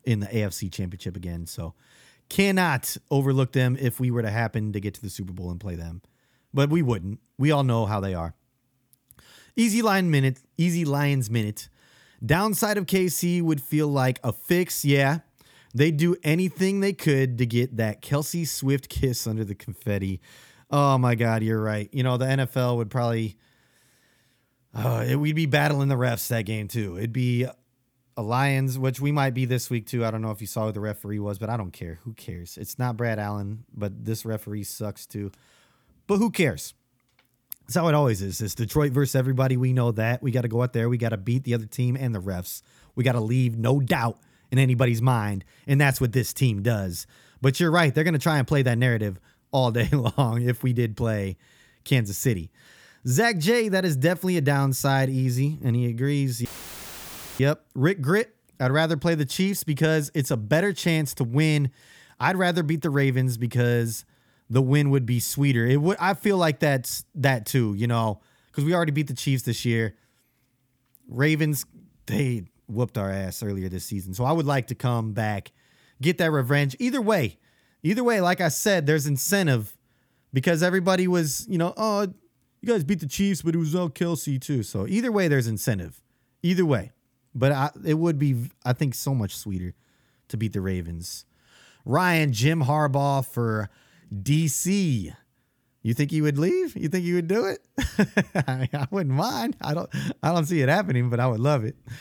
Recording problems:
audio cutting out; filled with static; at 56 s for 1 s

